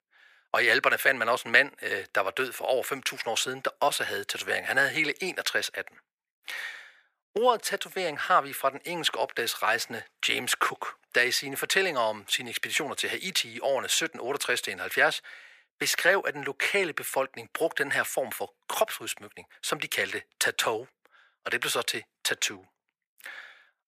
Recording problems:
thin; very; fading below 500 Hz

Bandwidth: 15 kHz